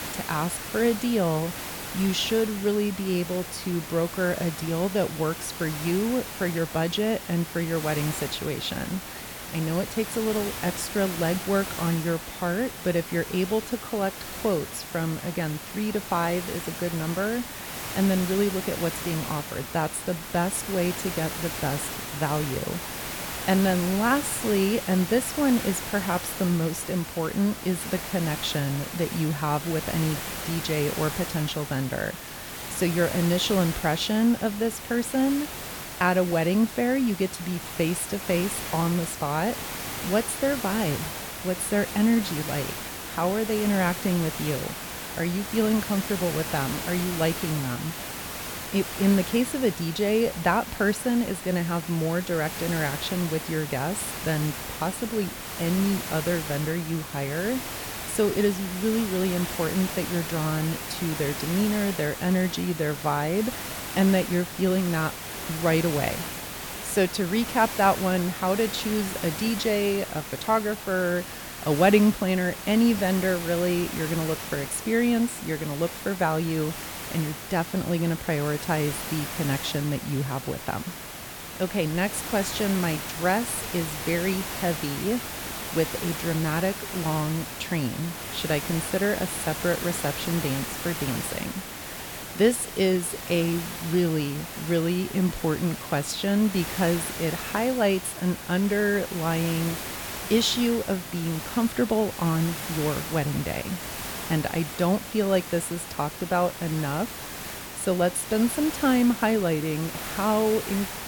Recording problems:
hiss; loud; throughout; 7 dB below the speech

